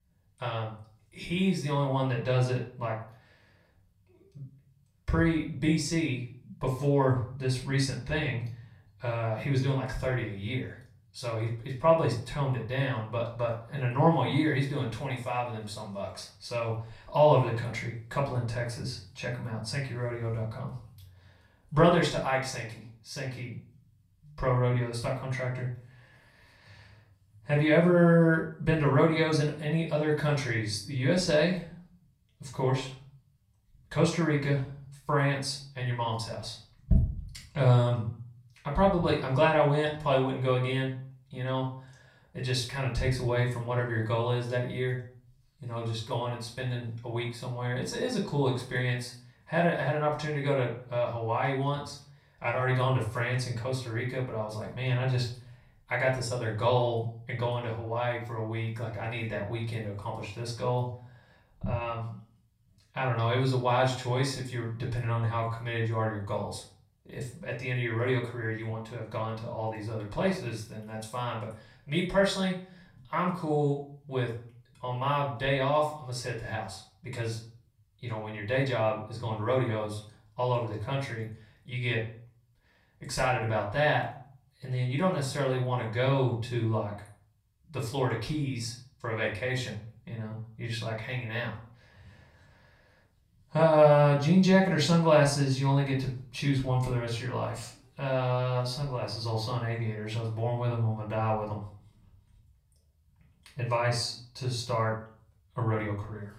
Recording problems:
off-mic speech; far
room echo; slight; dies away in 0.4 s

